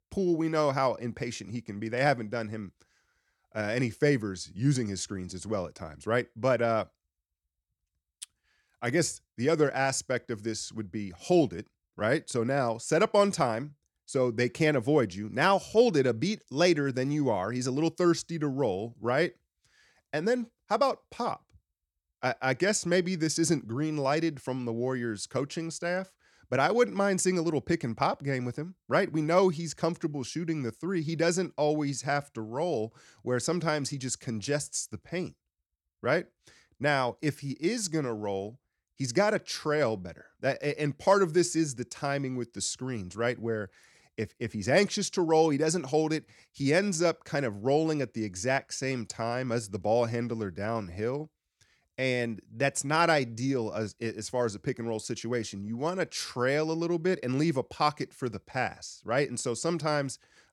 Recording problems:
none

